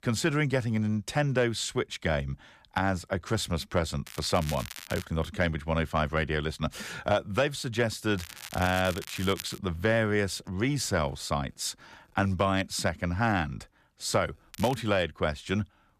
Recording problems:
crackling; noticeable; at 4 s, from 8 to 9.5 s and at 15 s; 15 dB below the speech

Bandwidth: 14.5 kHz